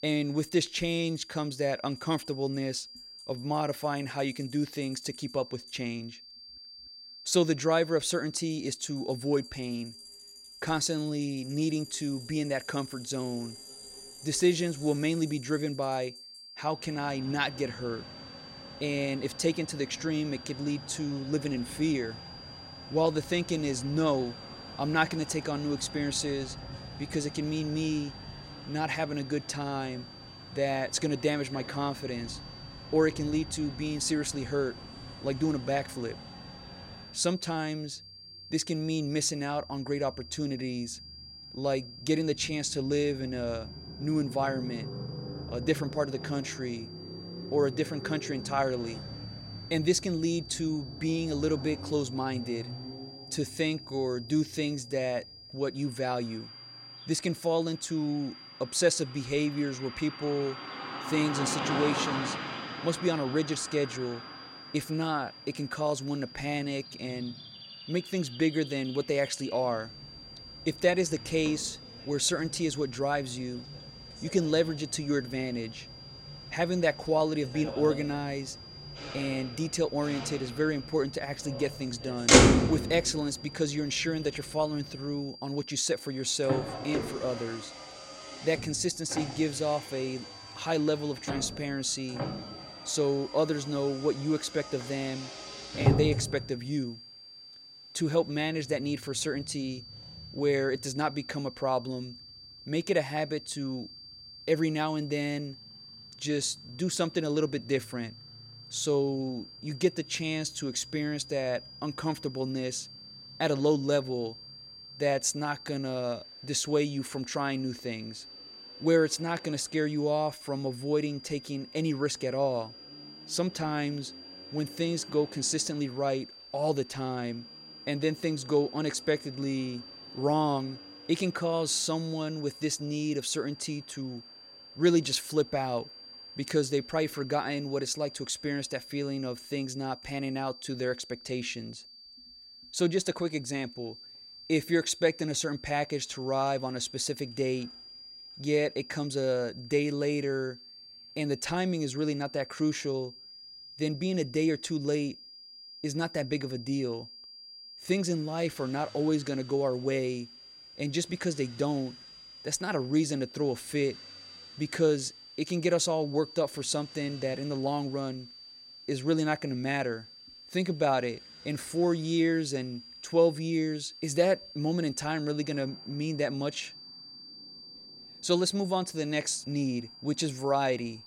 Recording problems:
traffic noise; loud; throughout; 7 dB below the speech
high-pitched whine; noticeable; throughout; 5 kHz, 15 dB below the speech

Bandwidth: 16 kHz